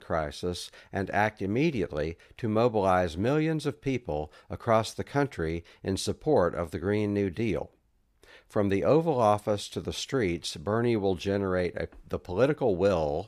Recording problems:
none

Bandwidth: 15 kHz